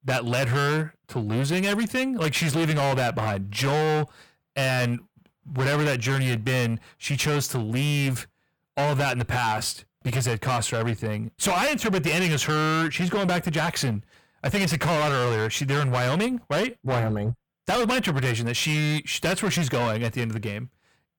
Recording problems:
distortion; heavy; 24% of the sound clipped

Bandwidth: 18.5 kHz